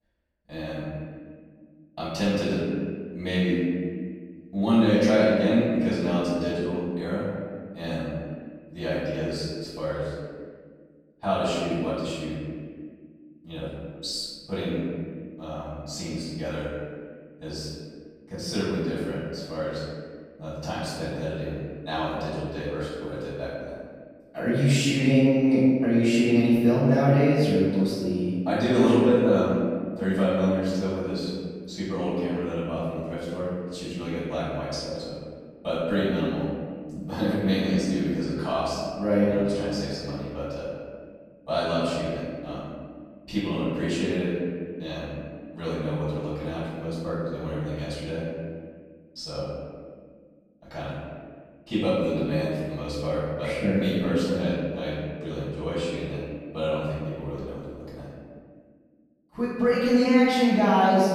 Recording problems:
room echo; strong; dies away in 1.9 s
off-mic speech; far

